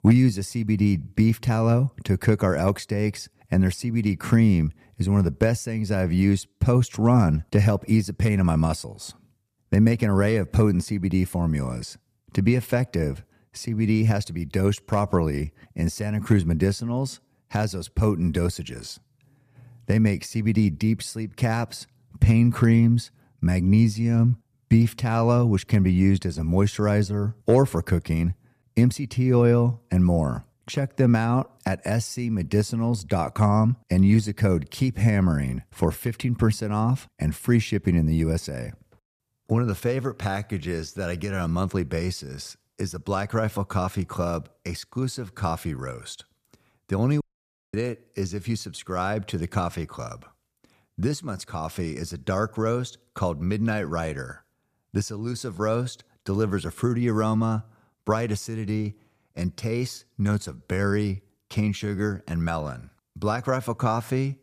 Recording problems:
audio cutting out; at 47 s for 0.5 s

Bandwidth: 14.5 kHz